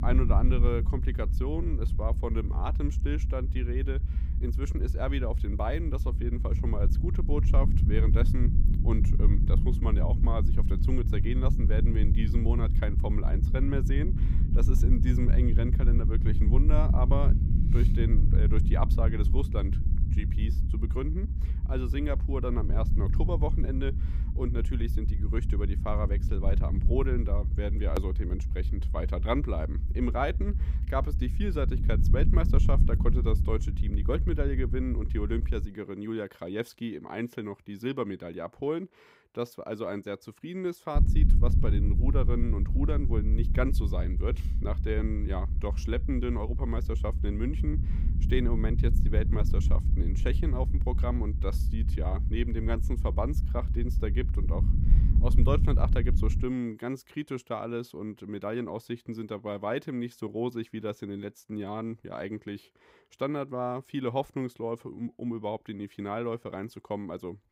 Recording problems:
low rumble; loud; until 36 s and from 41 to 56 s; 8 dB below the speech

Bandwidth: 15.5 kHz